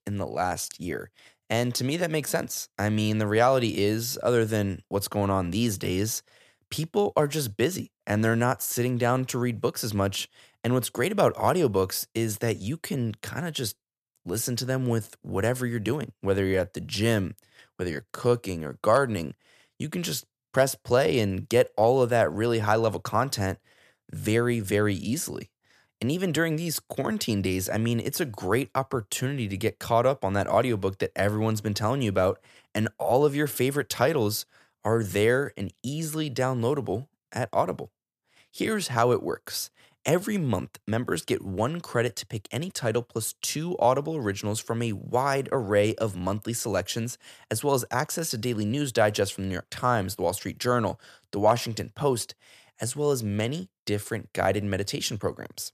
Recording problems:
none

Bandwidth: 14.5 kHz